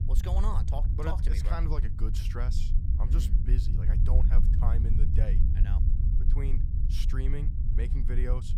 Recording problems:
low rumble; loud; throughout; 4 dB below the speech

